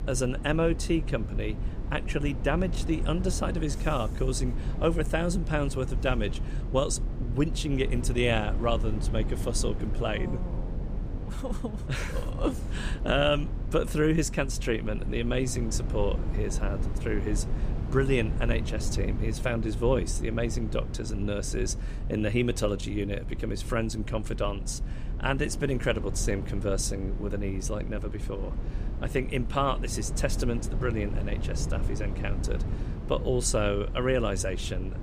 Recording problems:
low rumble; noticeable; throughout; 15 dB below the speech

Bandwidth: 15 kHz